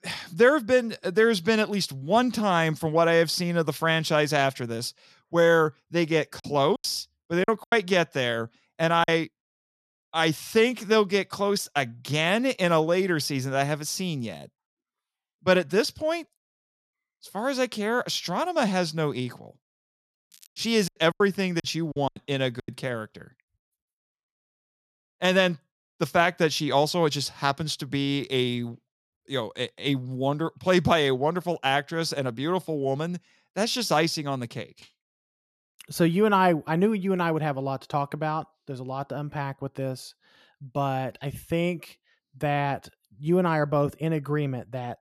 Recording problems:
crackling; faint; at 20 s; 25 dB below the speech
choppy; very; from 6.5 to 9 s and from 21 to 23 s; 11% of the speech affected

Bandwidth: 13.5 kHz